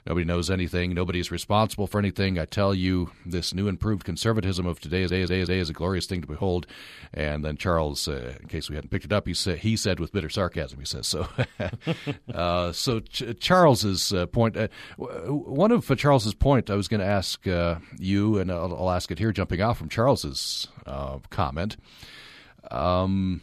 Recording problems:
audio stuttering; at 5 s

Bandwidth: 14.5 kHz